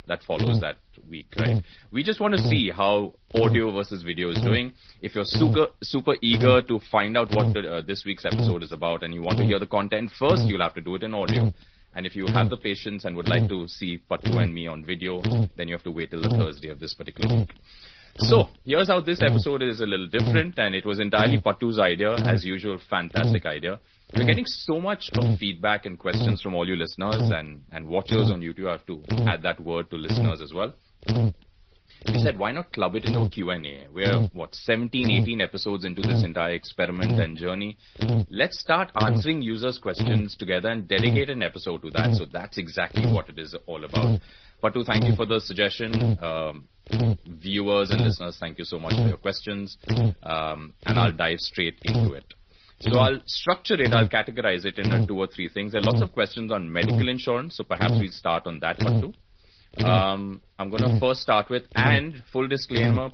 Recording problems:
high frequencies cut off; noticeable; nothing above 5.5 kHz
garbled, watery; slightly
electrical hum; loud; throughout; 50 Hz, 7 dB below the speech

